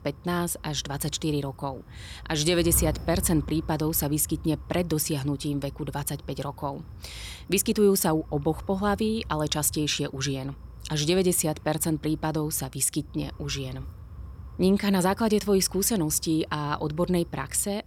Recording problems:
wind noise on the microphone; occasional gusts; 25 dB below the speech

